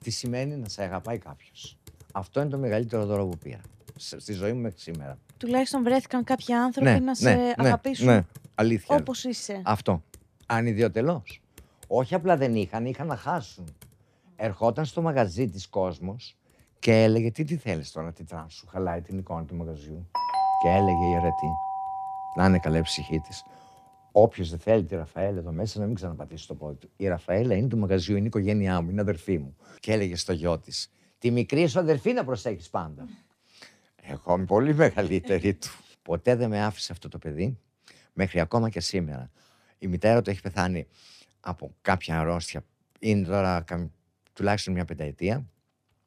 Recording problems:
household noises; faint; throughout; 30 dB below the speech
uneven, jittery; strongly; from 2 to 44 s
doorbell; loud; from 20 to 23 s; peak 3 dB above the speech

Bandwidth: 14.5 kHz